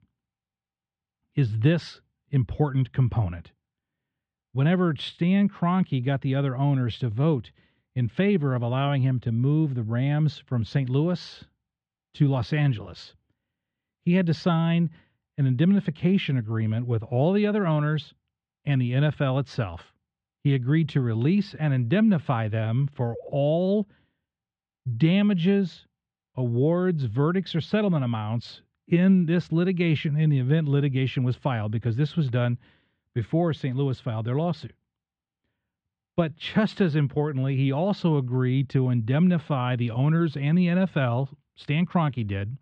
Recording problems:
muffled; slightly; fading above 3.5 kHz

